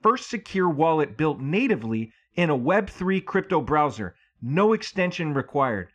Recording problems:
muffled; slightly; fading above 2.5 kHz

